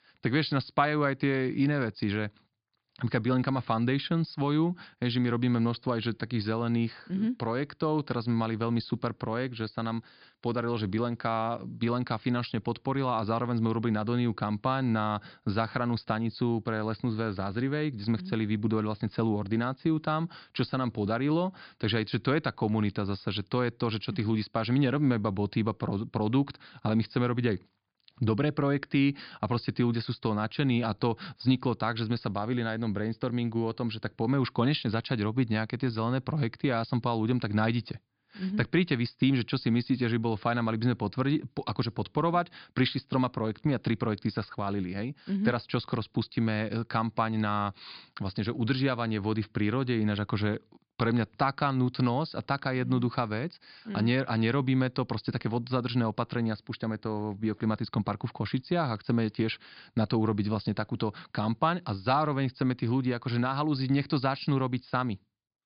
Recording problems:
high frequencies cut off; severe; nothing above 5 kHz

